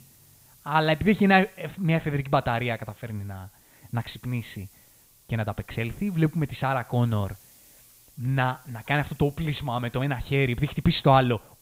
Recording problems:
high frequencies cut off; severe; nothing above 4 kHz
hiss; faint; throughout; 25 dB below the speech

